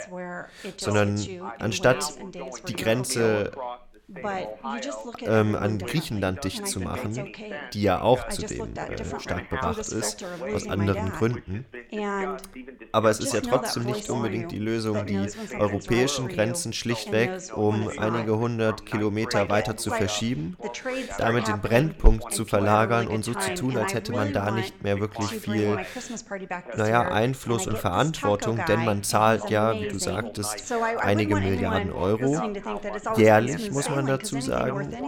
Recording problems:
background chatter; loud; throughout; 2 voices, 7 dB below the speech

